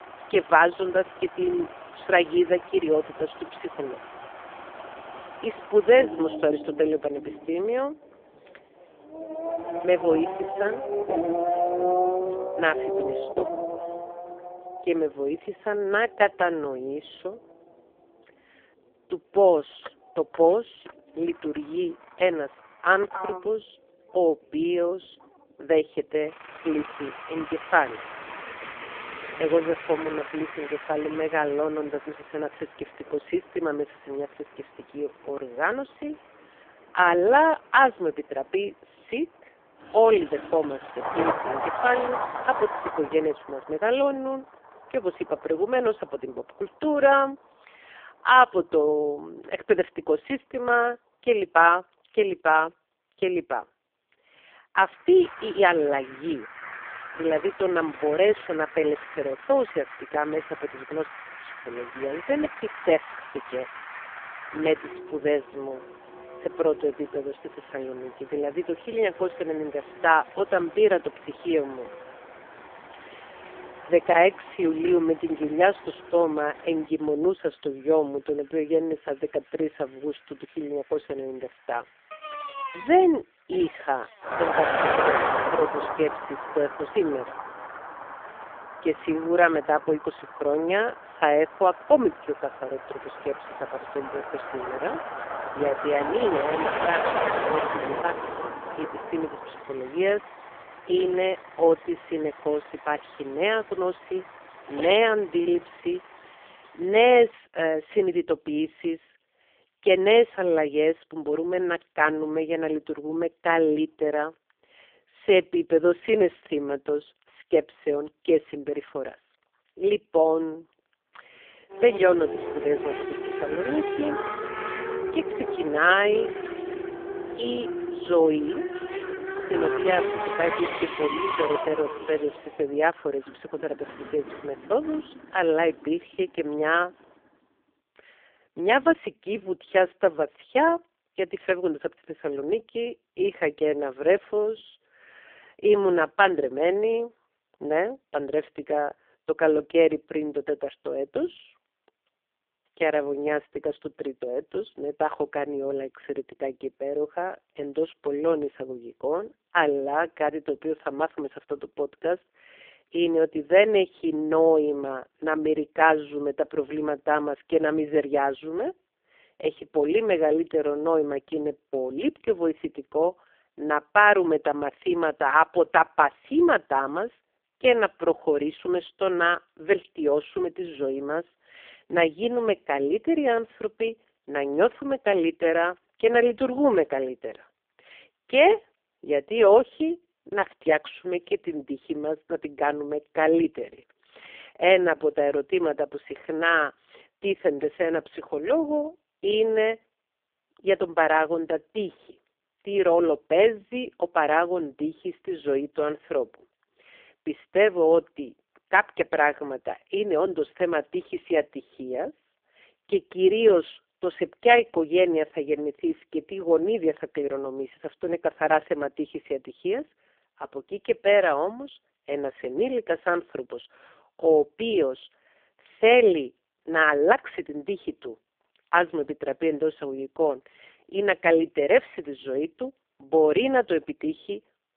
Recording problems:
phone-call audio; poor line; nothing above 3 kHz
traffic noise; loud; until 2:17; 9 dB below the speech

